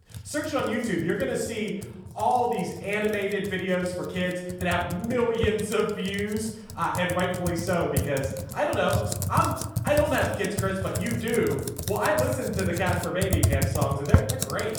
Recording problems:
off-mic speech; far
room echo; noticeable; dies away in 1 s
household noises; loud; throughout; 3 dB below the speech

